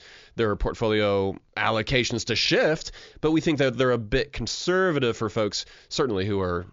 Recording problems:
high frequencies cut off; noticeable; nothing above 7 kHz

